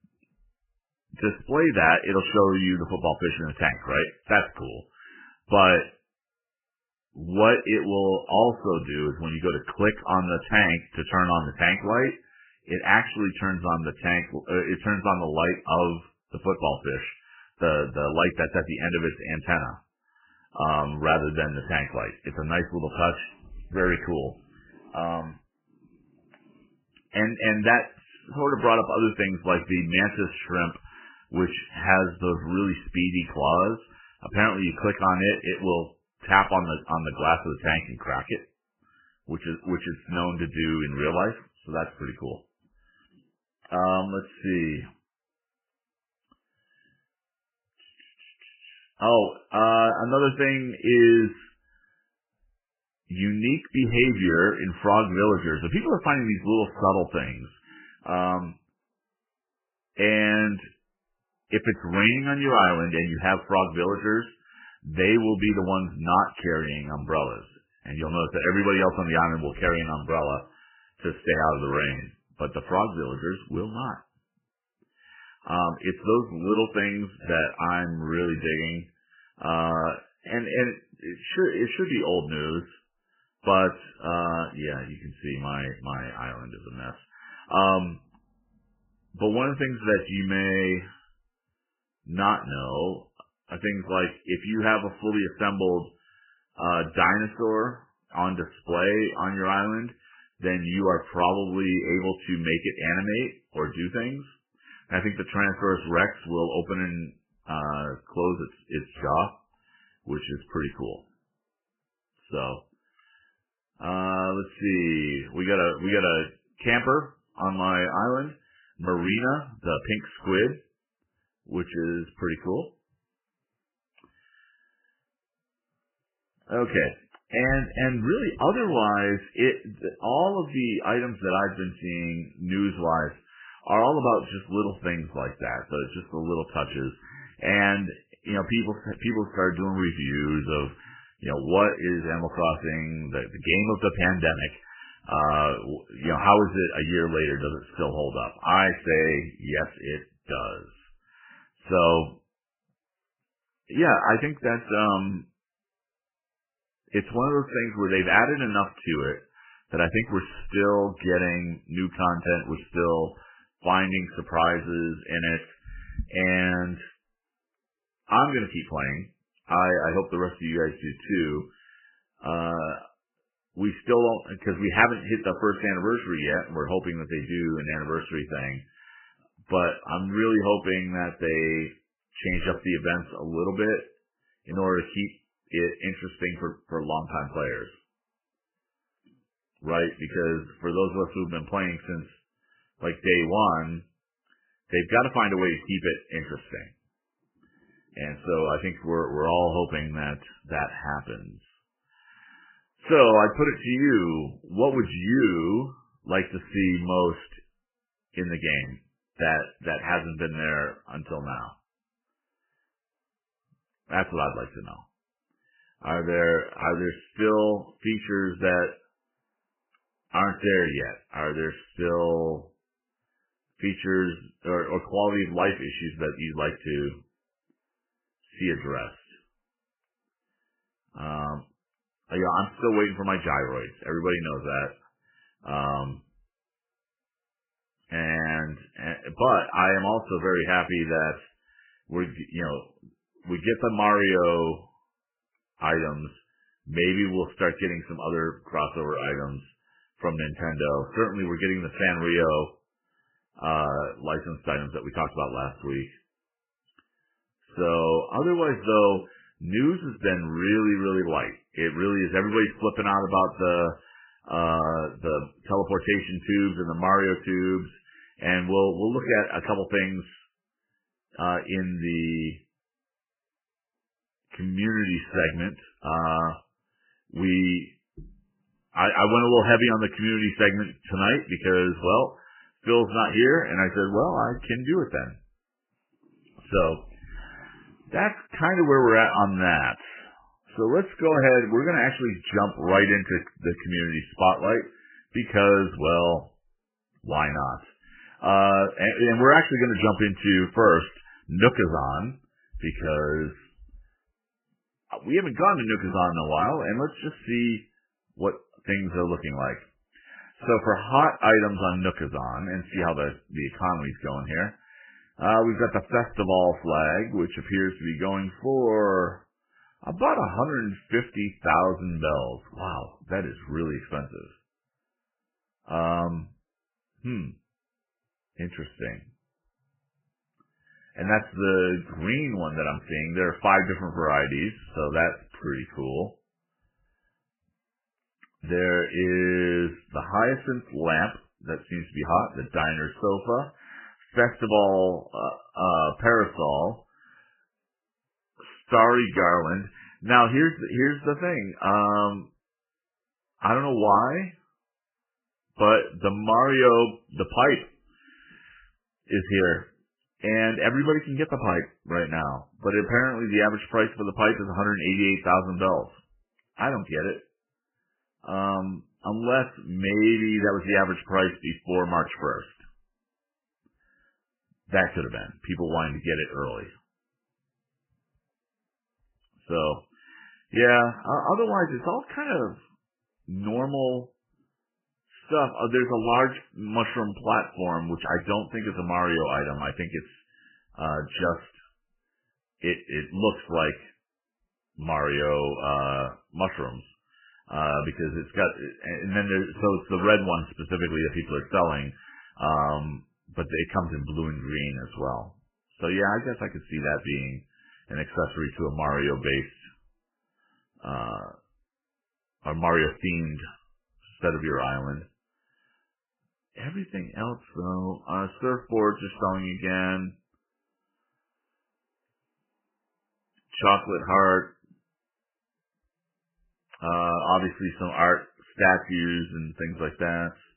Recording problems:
garbled, watery; badly; nothing above 3 kHz

